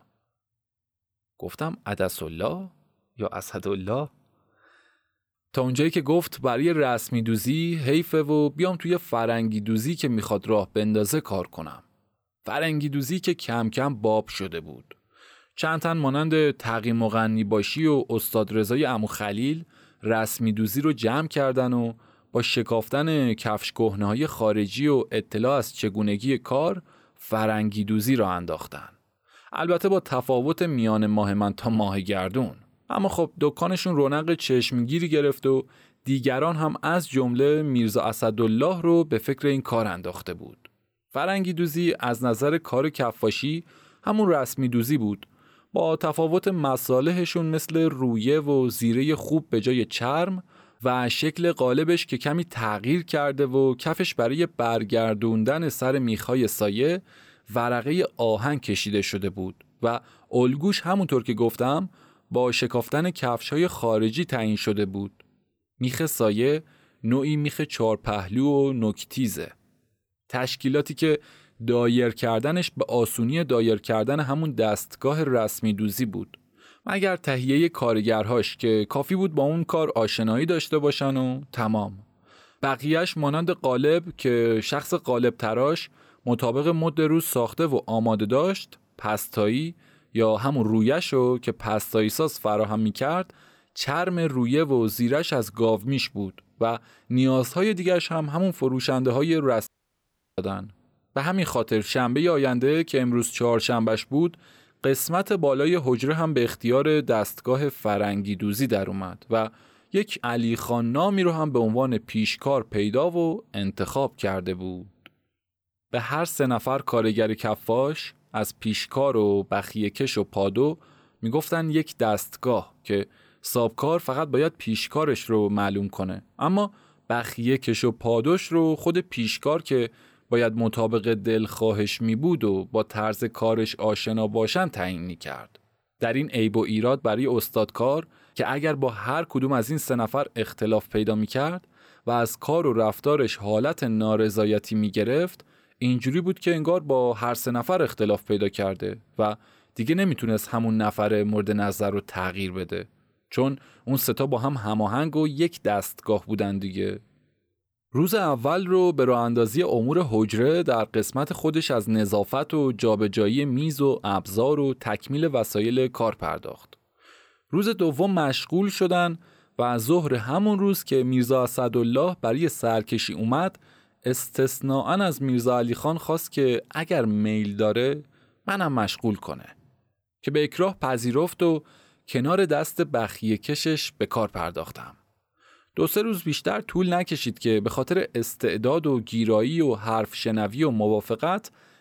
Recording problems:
audio cutting out; at 1:40 for 0.5 s

